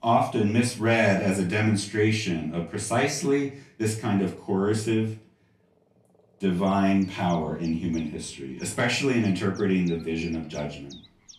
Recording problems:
off-mic speech; far
room echo; slight; dies away in 0.3 s
animal sounds; faint; throughout; 25 dB below the speech

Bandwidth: 14 kHz